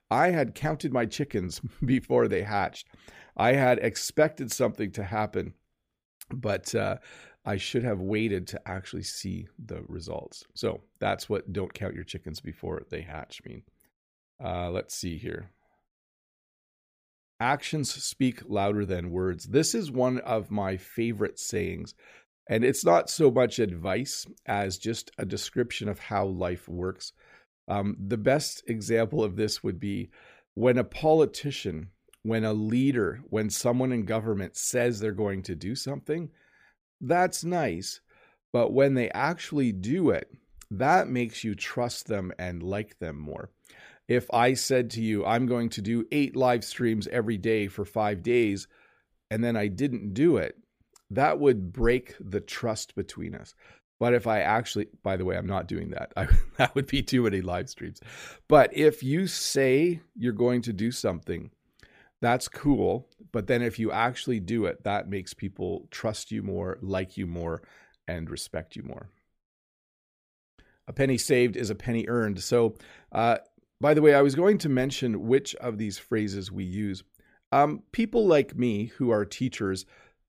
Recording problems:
none

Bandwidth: 15 kHz